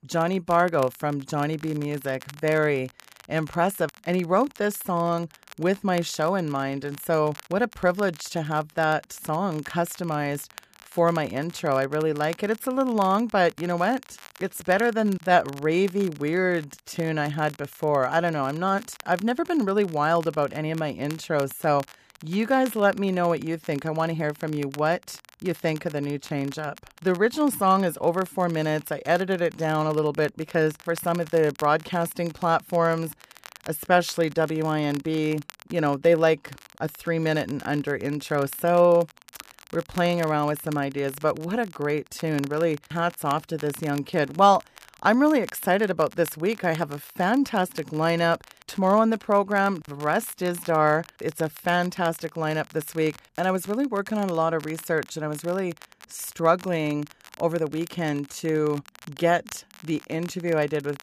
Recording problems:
crackle, like an old record; faint; 20 dB below the speech

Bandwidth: 14.5 kHz